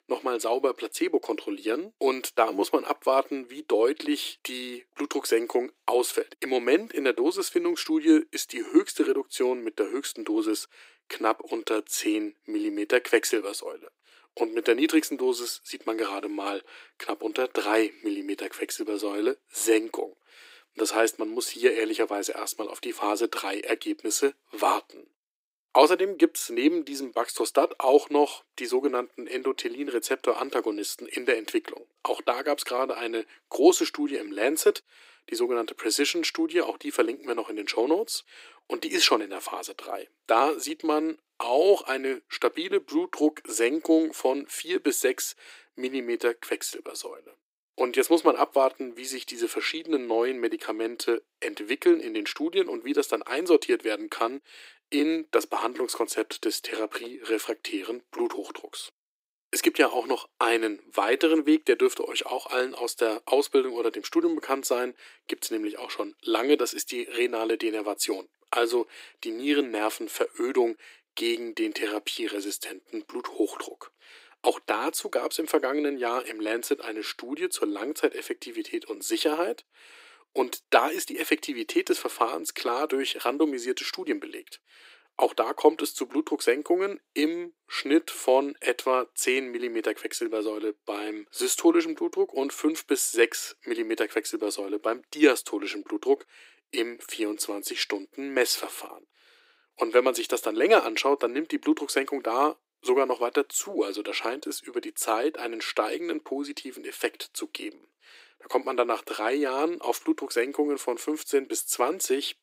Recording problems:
thin; very; fading below 300 Hz

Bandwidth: 15.5 kHz